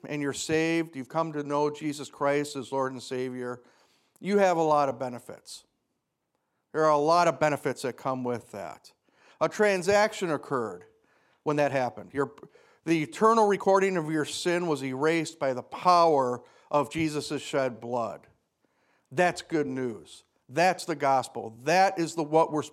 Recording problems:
uneven, jittery; strongly; from 1 to 22 s

